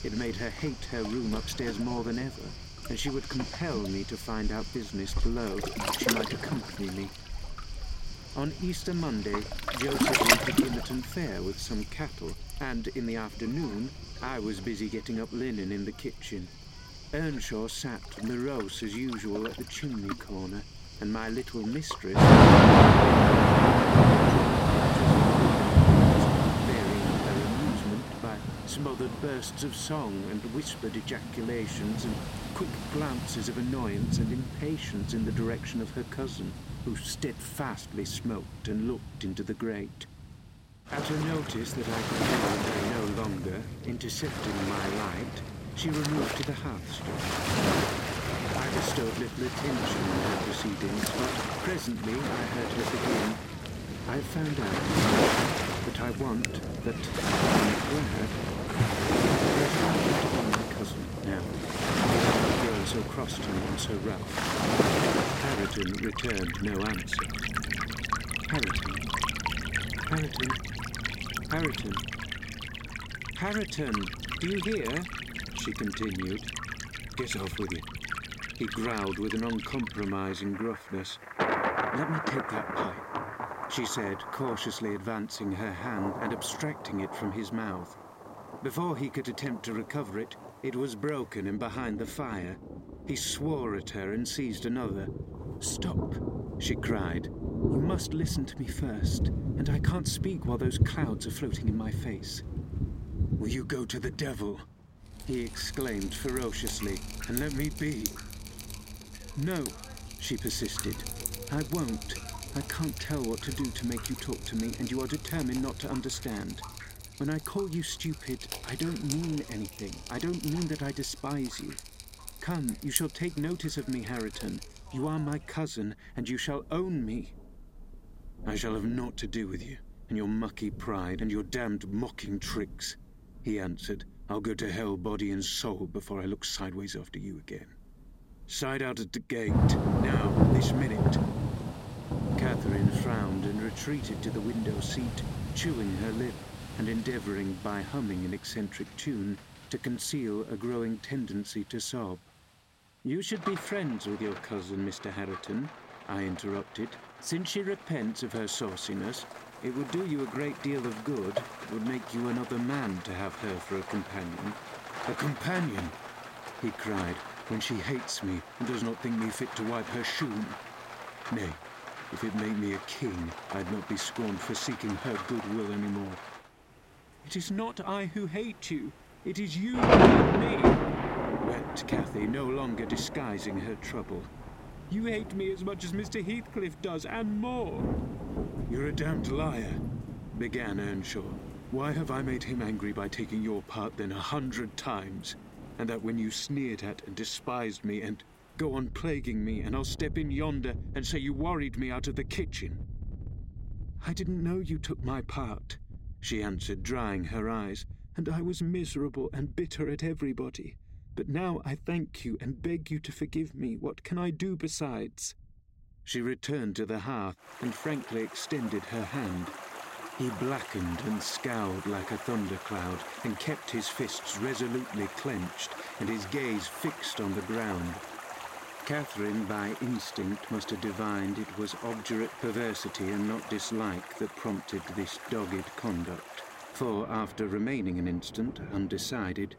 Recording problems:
rain or running water; very loud; throughout; 5 dB above the speech

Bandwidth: 16 kHz